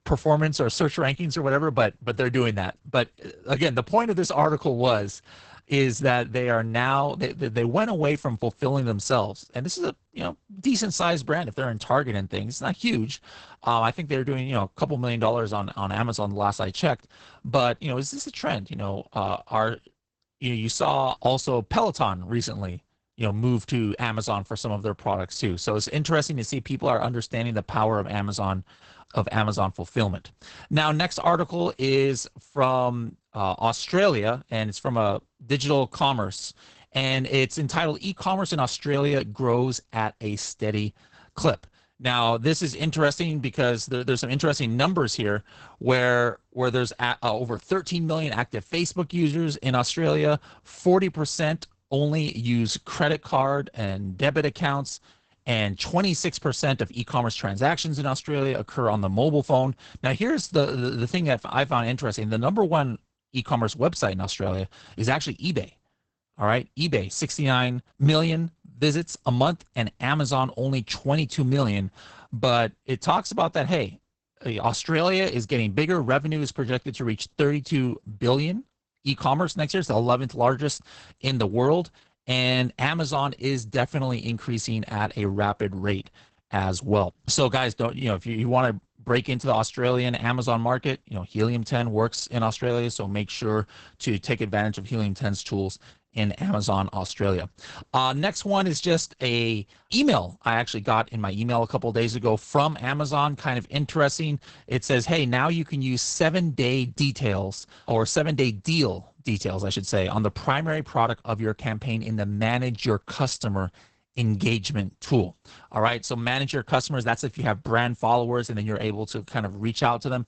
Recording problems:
garbled, watery; badly; nothing above 8 kHz

